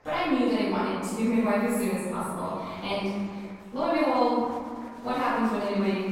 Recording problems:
room echo; strong; dies away in 1.6 s
off-mic speech; far
chatter from many people; faint; throughout; 20 dB below the speech

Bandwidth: 16.5 kHz